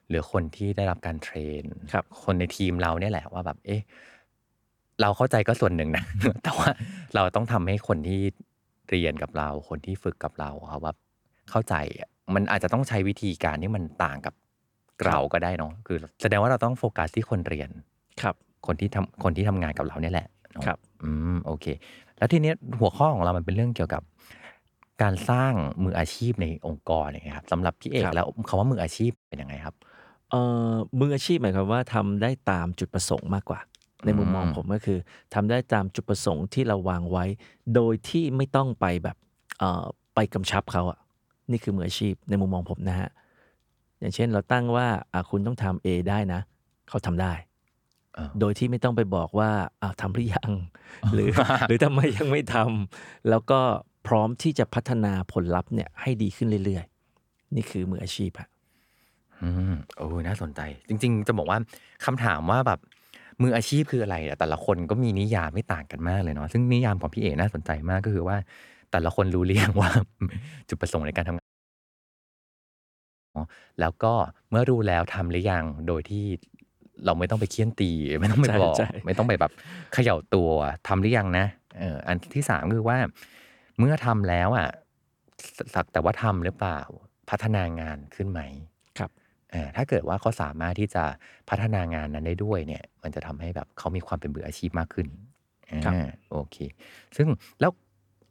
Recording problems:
audio cutting out; at 29 s and at 1:11 for 2 s

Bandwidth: 18.5 kHz